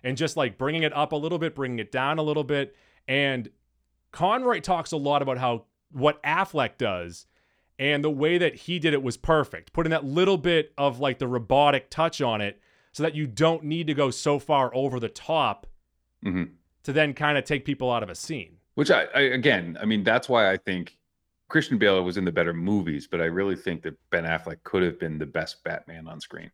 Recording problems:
none

